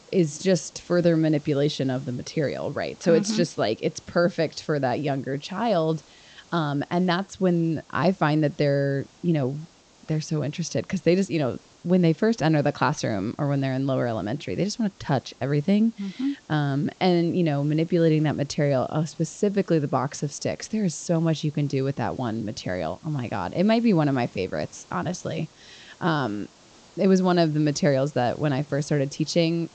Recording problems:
high frequencies cut off; noticeable; nothing above 8 kHz
hiss; faint; throughout; 30 dB below the speech

